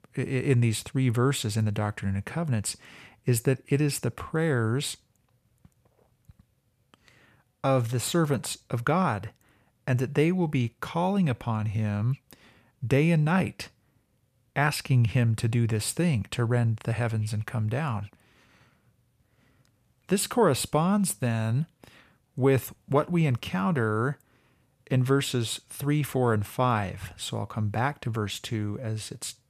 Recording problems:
none

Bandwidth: 14.5 kHz